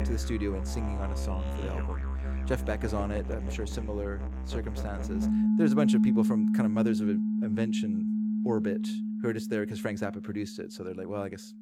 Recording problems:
background music; very loud; throughout; 5 dB above the speech

